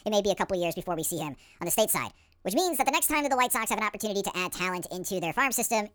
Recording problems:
wrong speed and pitch; too fast and too high; 1.6 times normal speed

